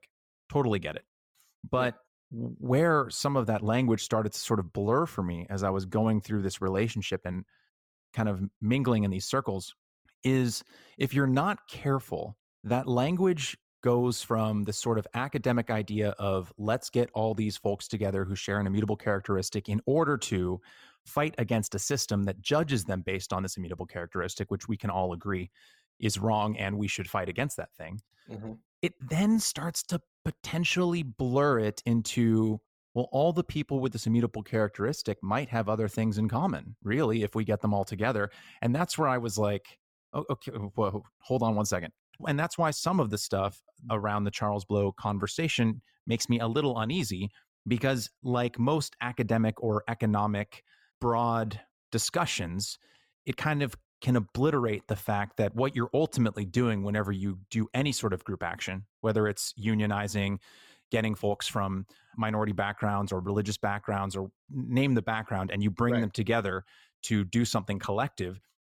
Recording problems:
none

